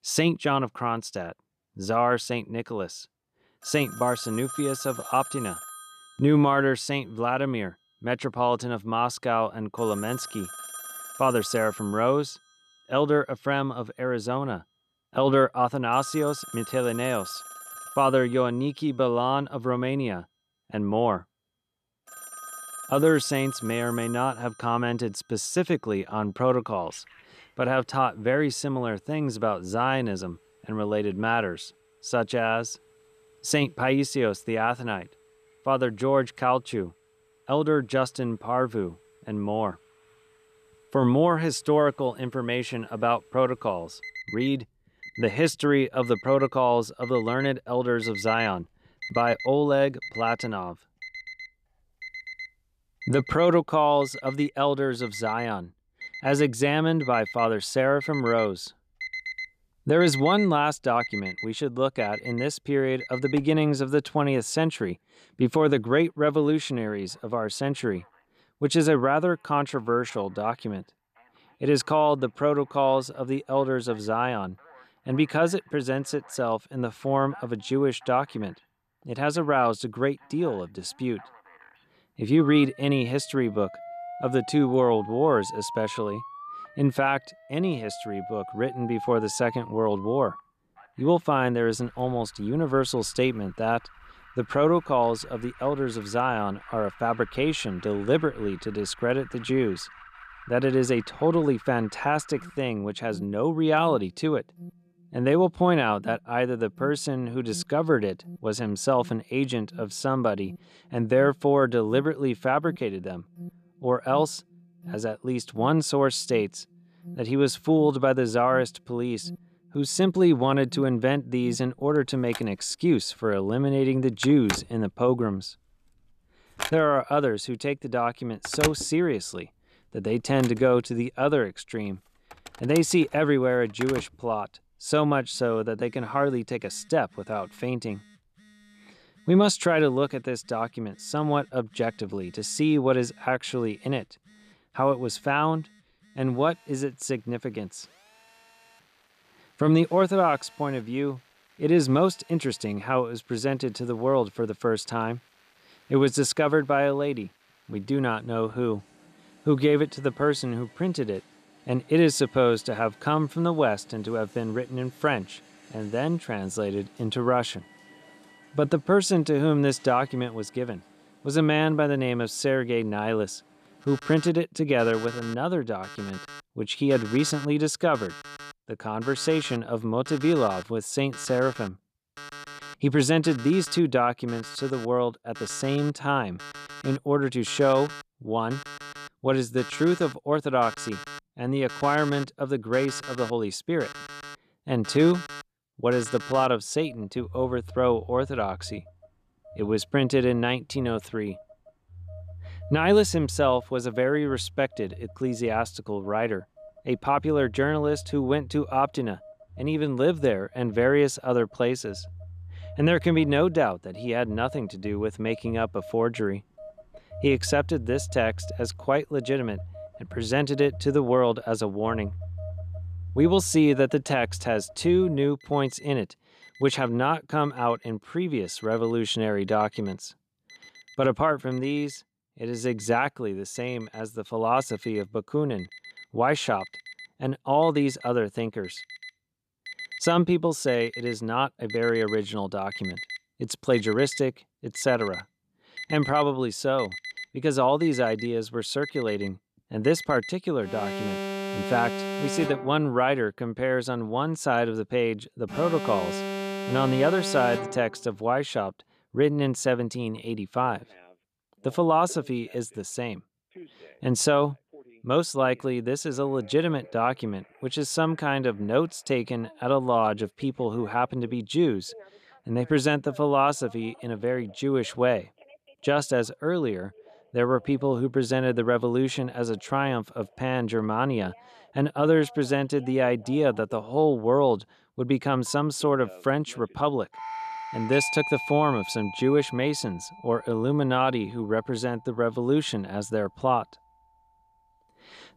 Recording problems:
alarms or sirens; noticeable; throughout; 15 dB below the speech

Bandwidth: 14.5 kHz